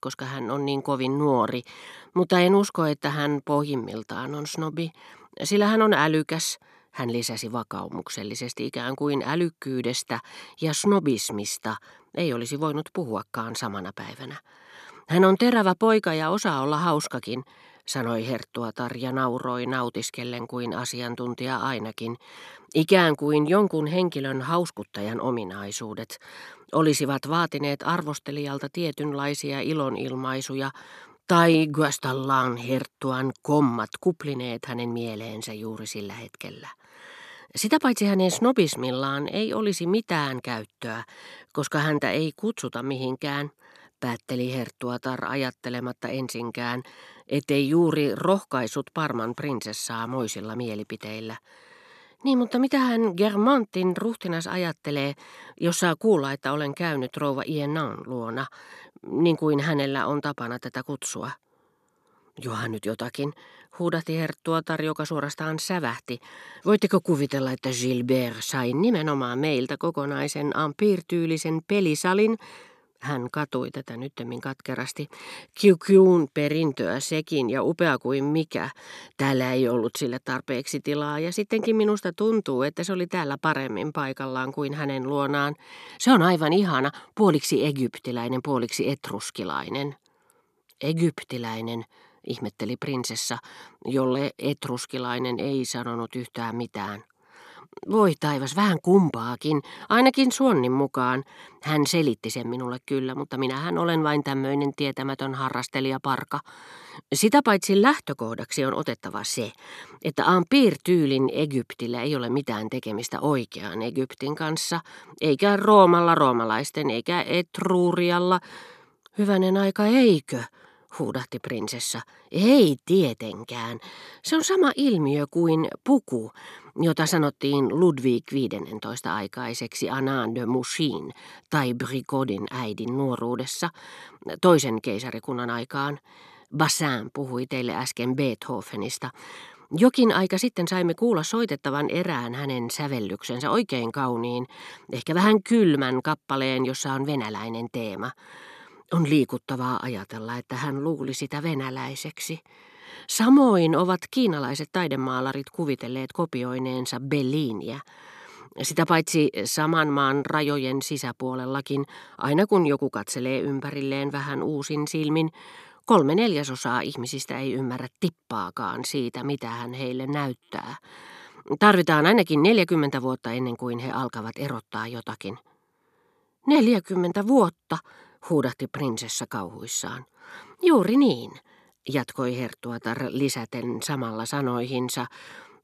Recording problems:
none

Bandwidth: 13.5 kHz